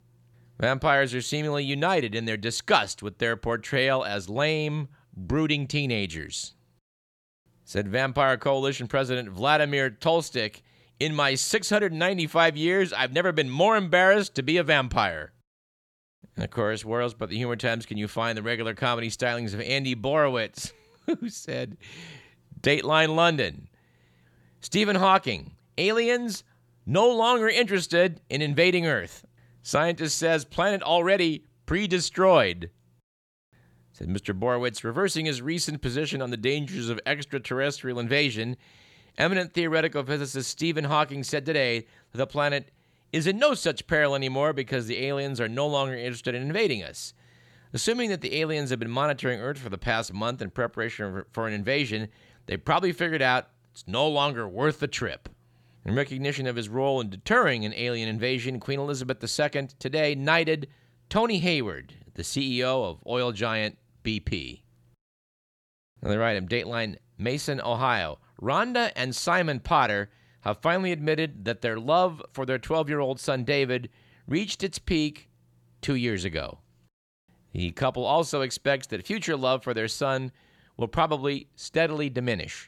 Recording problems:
none

